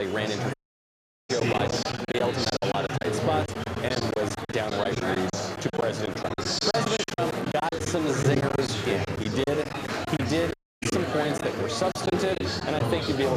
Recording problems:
murmuring crowd; very loud; throughout; 1 dB above the speech
high-pitched whine; faint; until 6 s; 3.5 kHz, 25 dB below the speech
choppy; very; 11% of the speech affected
abrupt cut into speech; at the start and the end
audio cutting out; at 0.5 s for 1 s and at 11 s

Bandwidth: 14.5 kHz